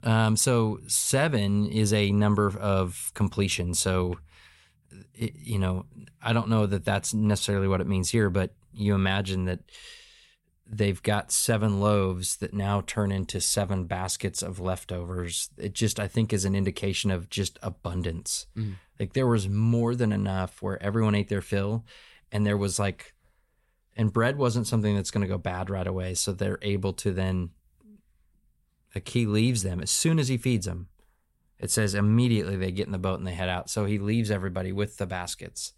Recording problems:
none

